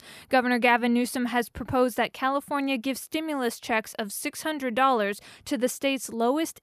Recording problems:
none

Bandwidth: 14.5 kHz